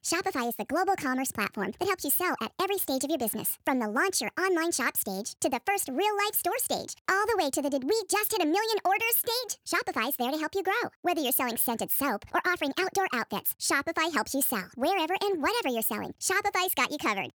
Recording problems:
wrong speed and pitch; too fast and too high; 1.5 times normal speed

